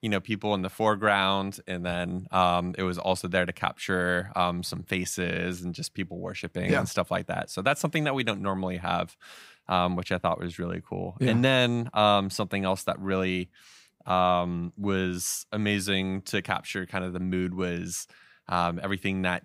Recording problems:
none

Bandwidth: 15.5 kHz